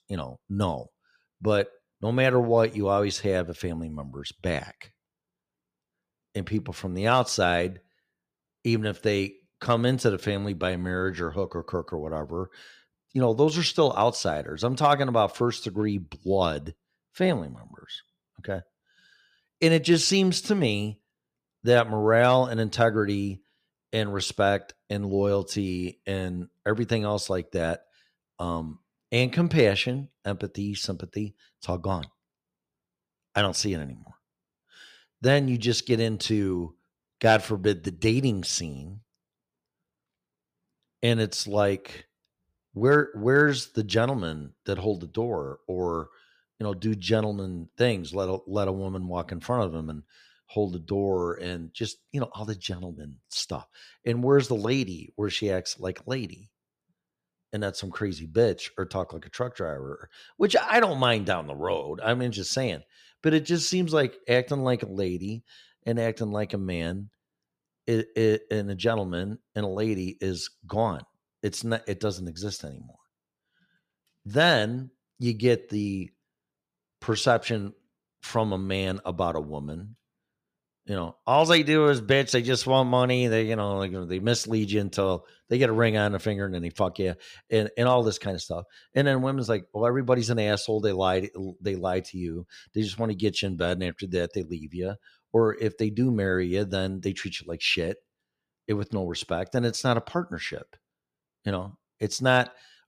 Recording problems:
none

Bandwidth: 15 kHz